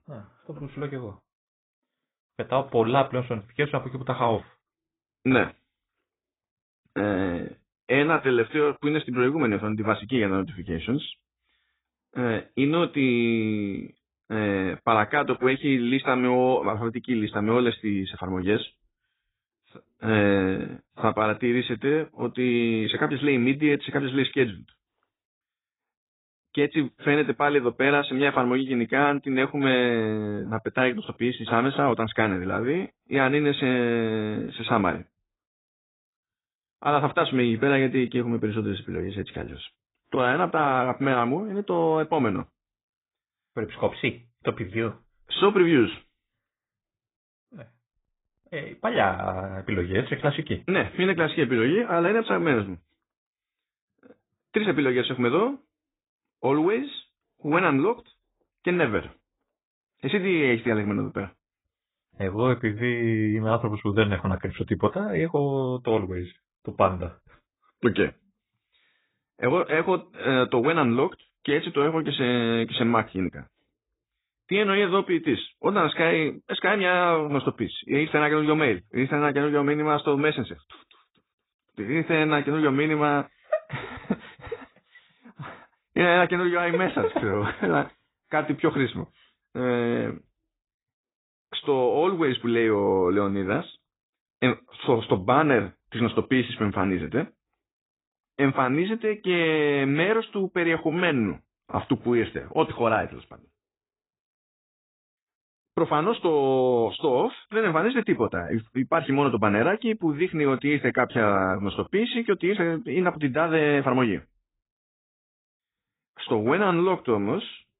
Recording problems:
garbled, watery; badly; nothing above 4 kHz

